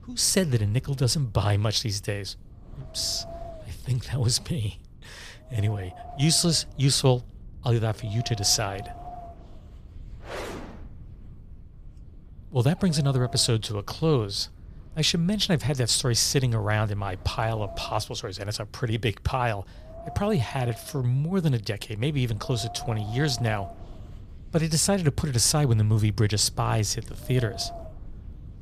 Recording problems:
wind noise on the microphone; occasional gusts; 15 dB below the speech

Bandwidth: 15 kHz